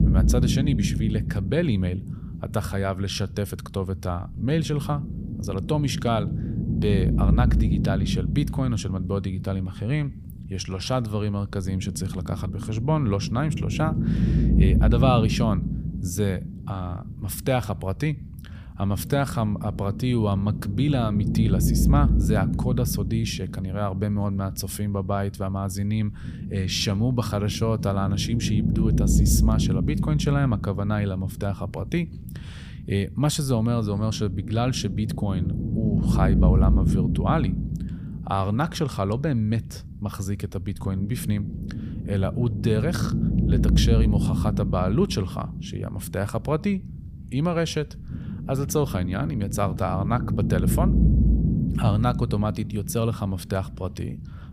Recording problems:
low rumble; loud; throughout; 6 dB below the speech

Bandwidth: 15 kHz